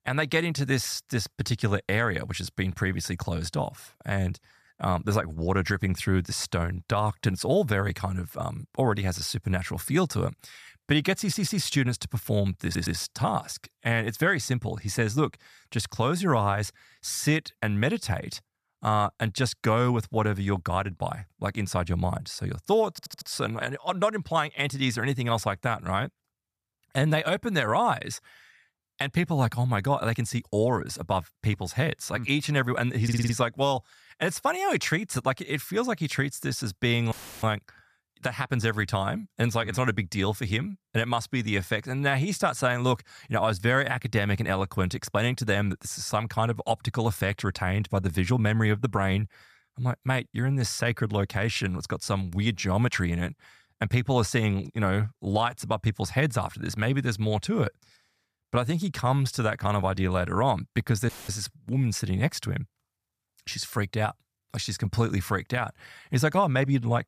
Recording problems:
audio stuttering; 4 times, first at 11 s
audio cutting out; filled with static; at 37 s and at 1:01

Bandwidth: 14.5 kHz